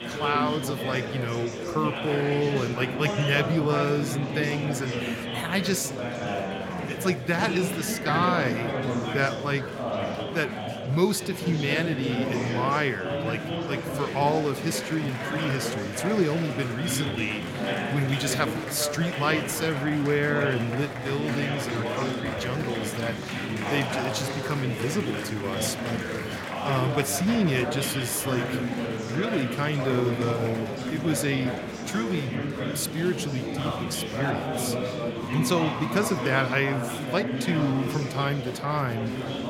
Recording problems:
murmuring crowd; loud; throughout; 2 dB below the speech

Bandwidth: 16.5 kHz